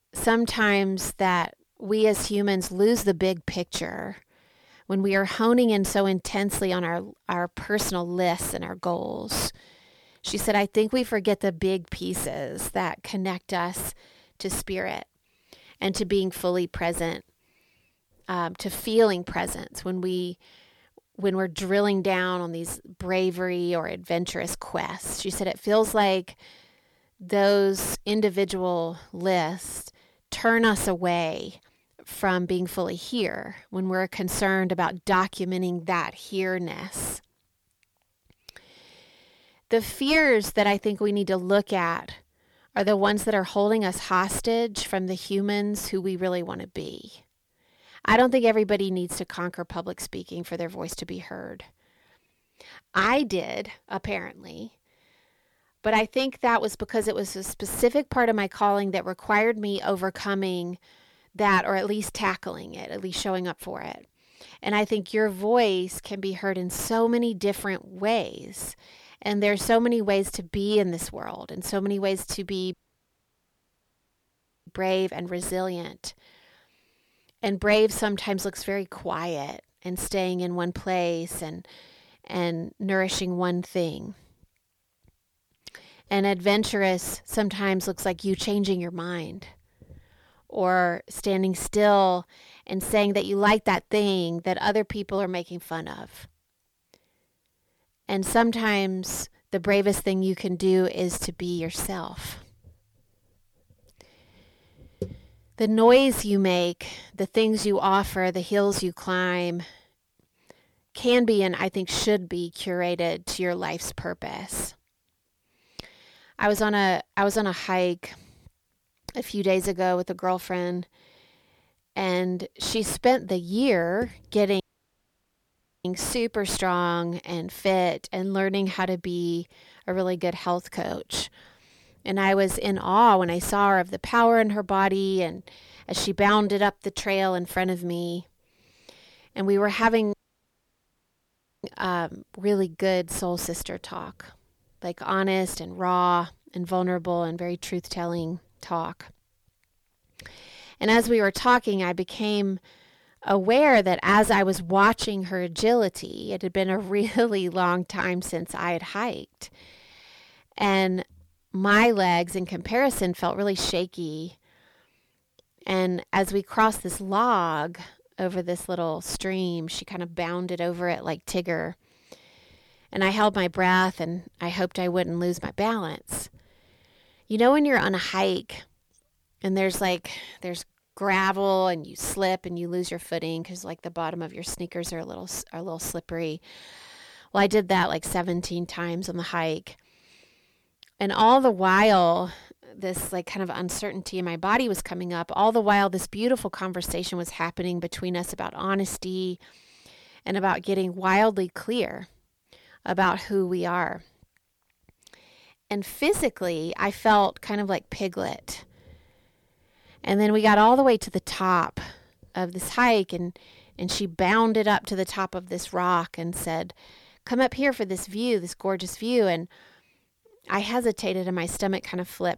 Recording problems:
distortion; slight; 10 dB below the speech
audio cutting out; at 1:13 for 2 s, at 2:05 for 1 s and at 2:20 for 1.5 s

